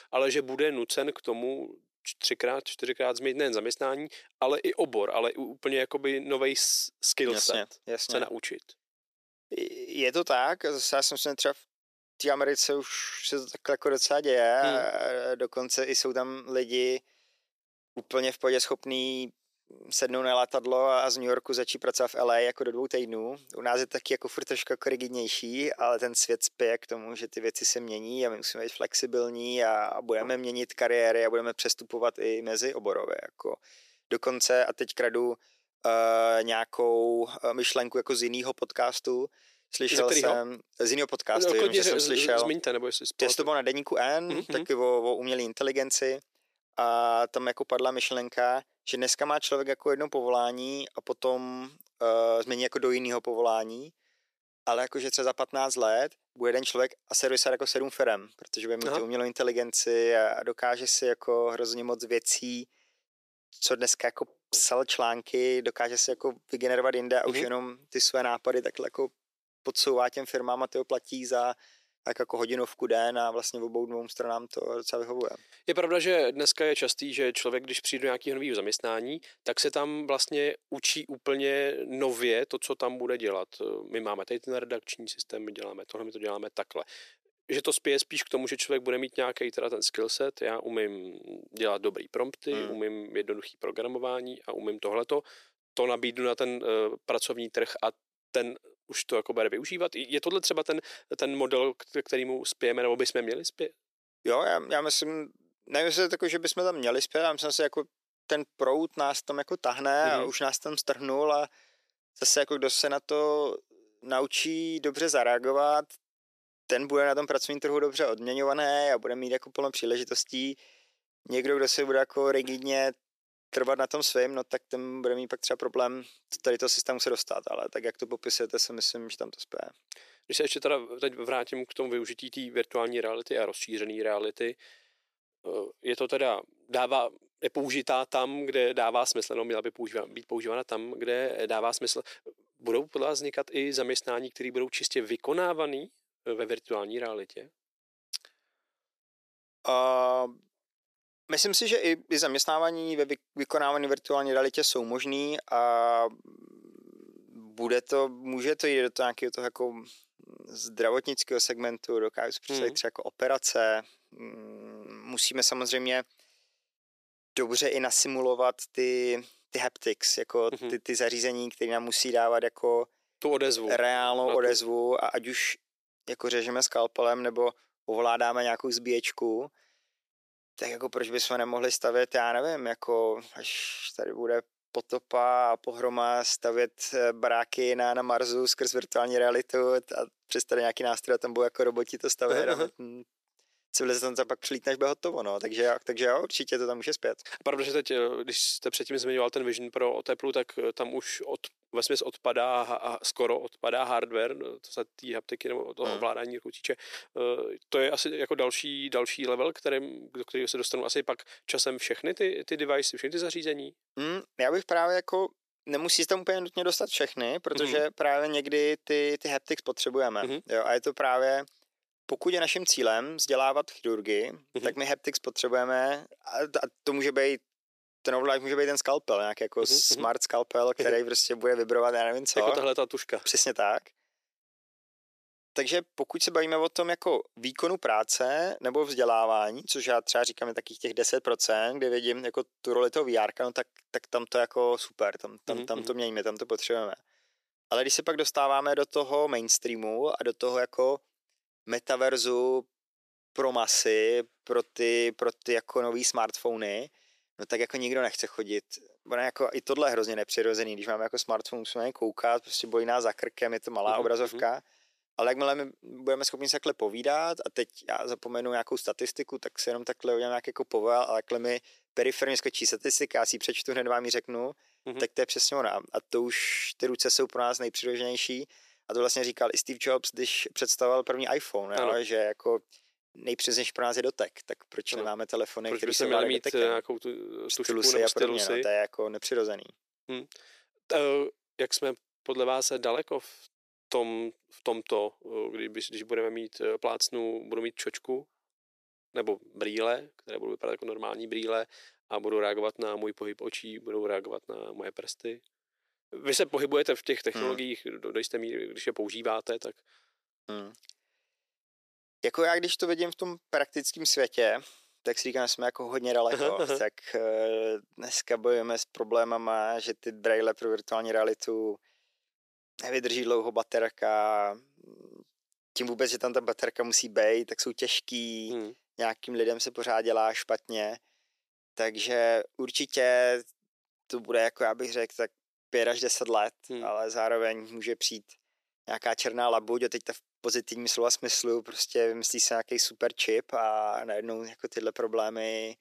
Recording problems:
thin; somewhat; fading below 350 Hz

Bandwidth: 14.5 kHz